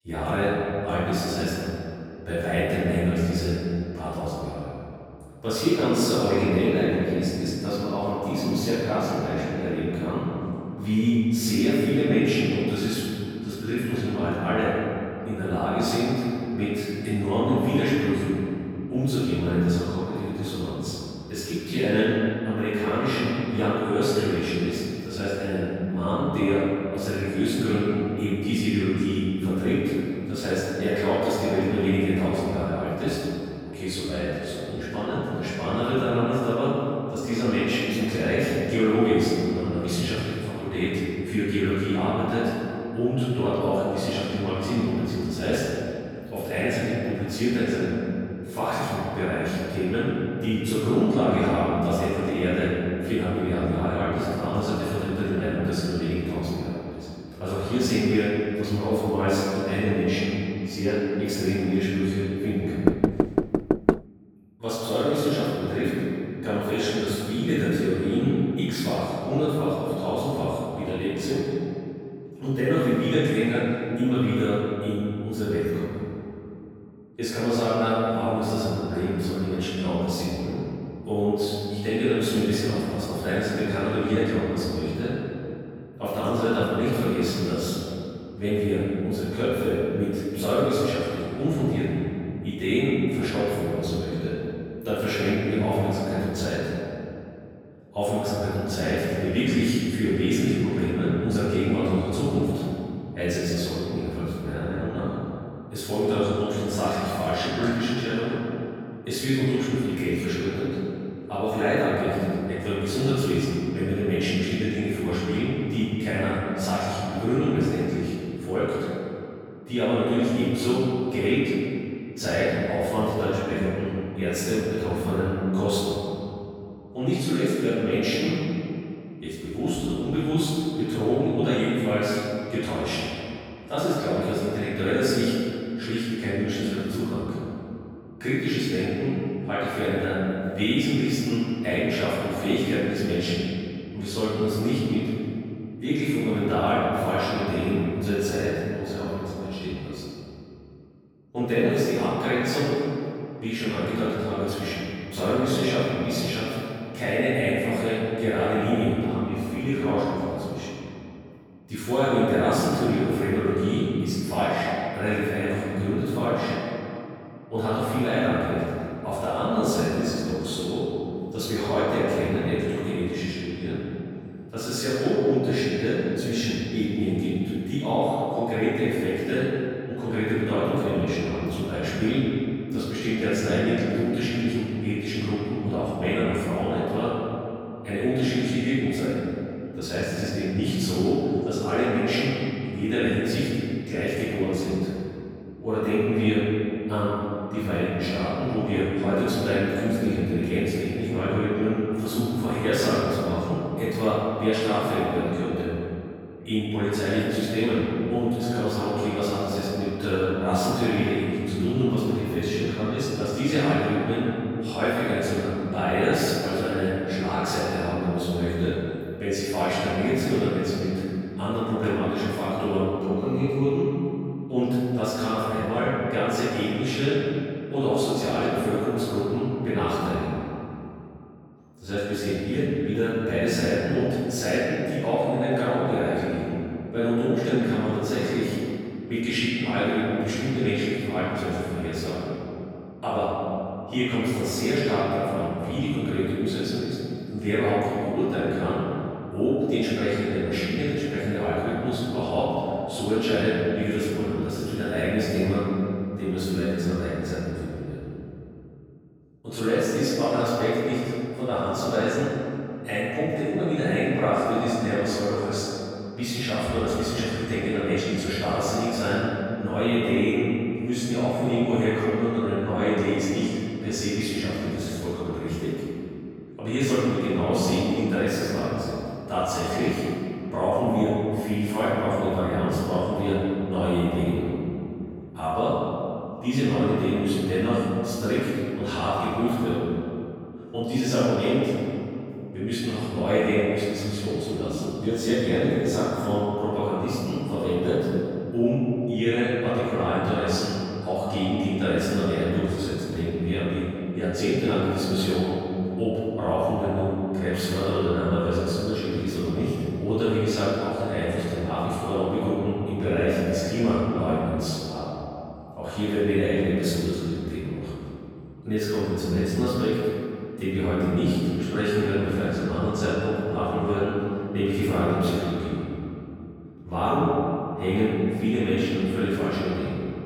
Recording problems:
room echo; strong; dies away in 2.5 s
off-mic speech; far
door banging; loud; from 1:03 to 1:04; peak 3 dB above the speech

